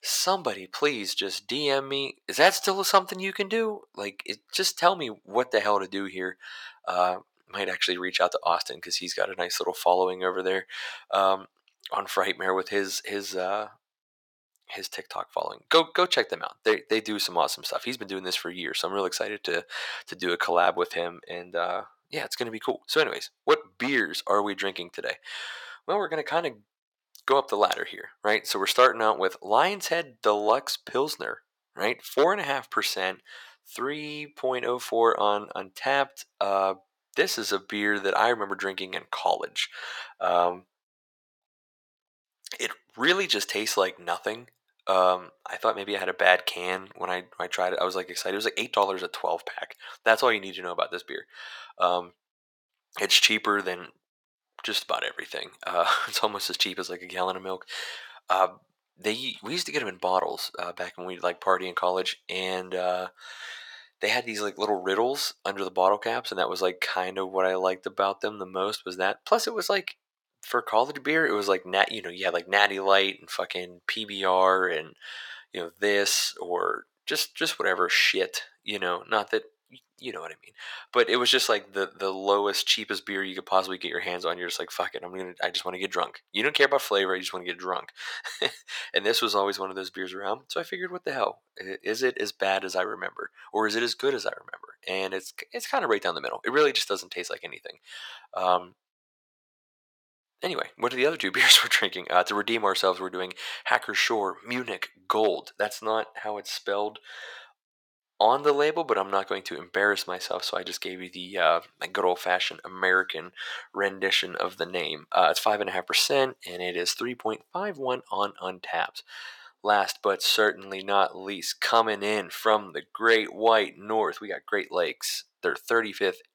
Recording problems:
thin; very; fading below 800 Hz

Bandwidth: 17.5 kHz